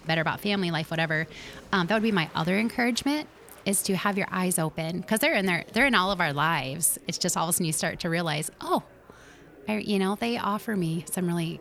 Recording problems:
murmuring crowd; faint; throughout; 25 dB below the speech

